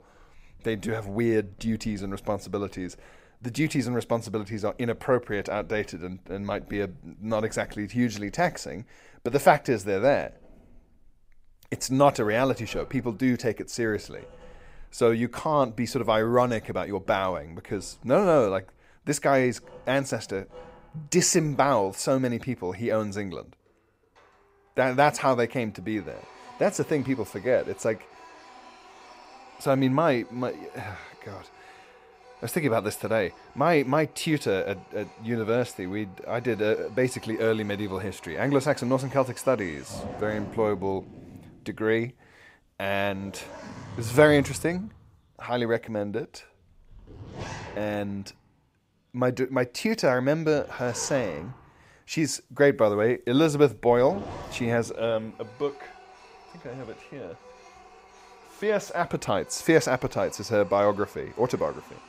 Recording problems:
household noises; faint; throughout; 20 dB below the speech

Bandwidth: 15.5 kHz